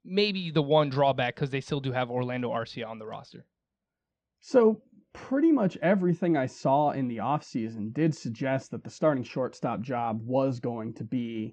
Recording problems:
muffled; very slightly; fading above 4 kHz

